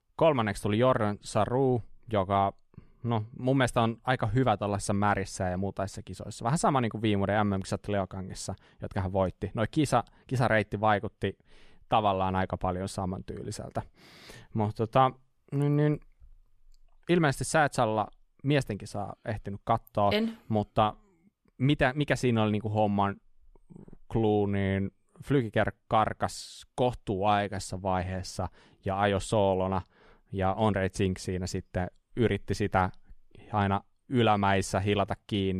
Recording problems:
abrupt cut into speech; at the end

